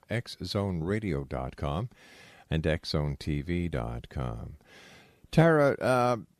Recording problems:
none

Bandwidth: 14 kHz